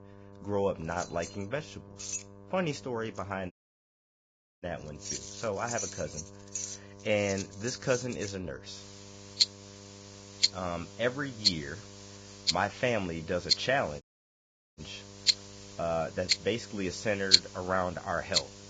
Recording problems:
garbled, watery; badly; nothing above 7.5 kHz
household noises; very loud; throughout; 4 dB above the speech
electrical hum; faint; throughout; 50 Hz, 20 dB below the speech
audio cutting out; at 3.5 s for 1 s and at 14 s for 1 s

